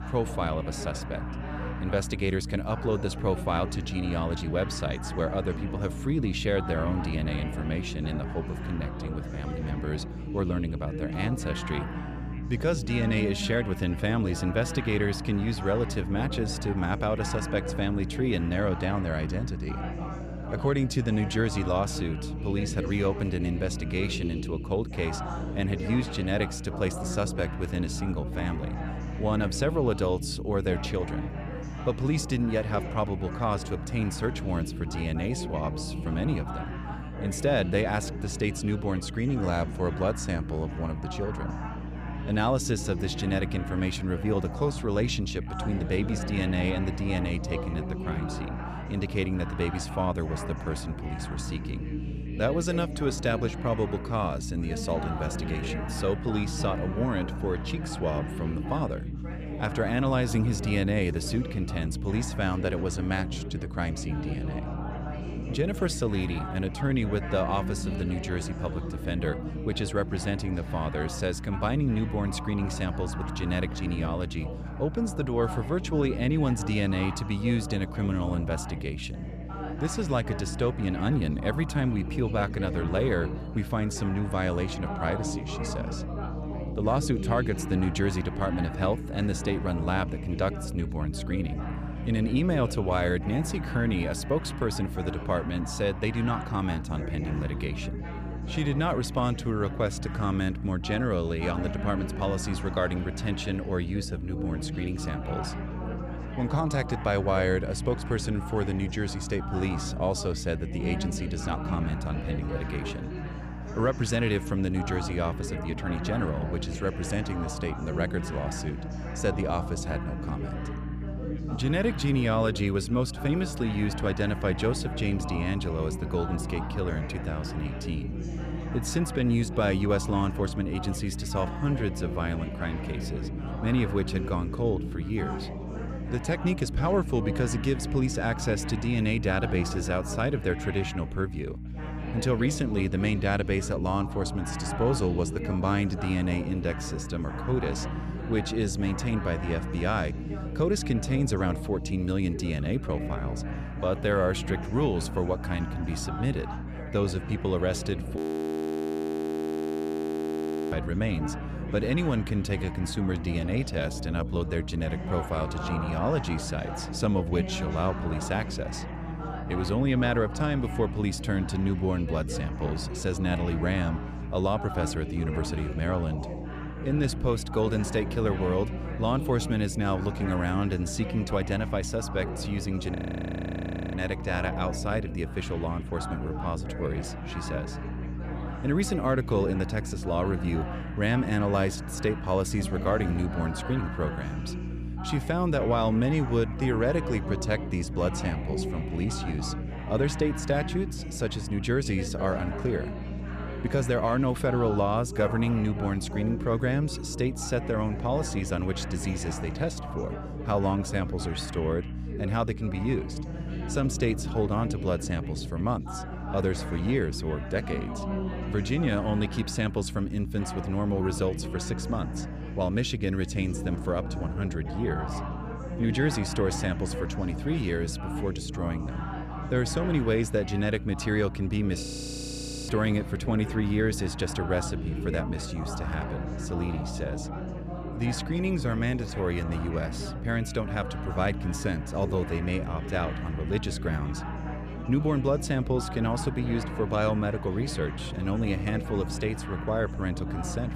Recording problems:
background chatter; loud; throughout; 3 voices, 9 dB below the speech
electrical hum; noticeable; throughout; 60 Hz, 15 dB below the speech
audio freezing; at 2:38 for 2.5 s, at 3:03 for 1 s and at 3:52 for 1 s

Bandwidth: 14.5 kHz